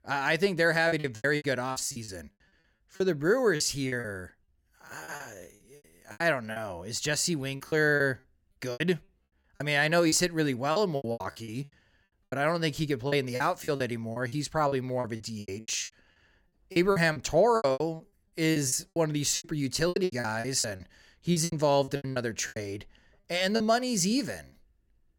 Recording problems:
choppy; very; 17% of the speech affected

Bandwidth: 17.5 kHz